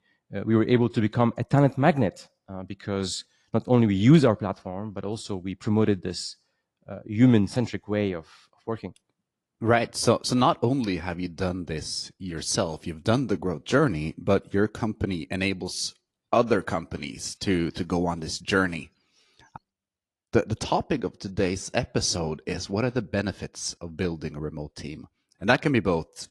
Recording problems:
garbled, watery; slightly; nothing above 11 kHz

